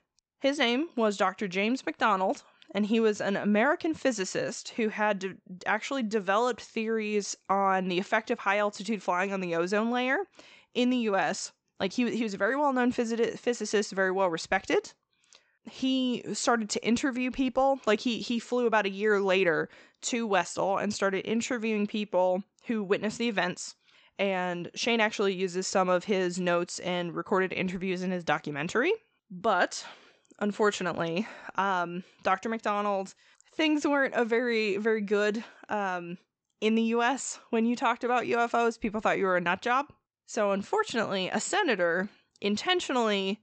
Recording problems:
high frequencies cut off; noticeable; nothing above 8 kHz

